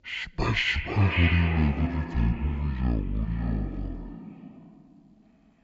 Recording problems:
echo of what is said; strong; throughout; 540 ms later, 7 dB below the speech
wrong speed and pitch; too slow and too low; 0.5 times normal speed

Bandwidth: 7.5 kHz